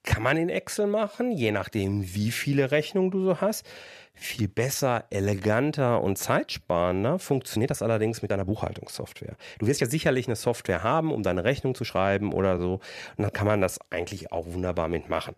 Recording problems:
uneven, jittery; strongly; from 1 to 14 s

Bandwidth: 14.5 kHz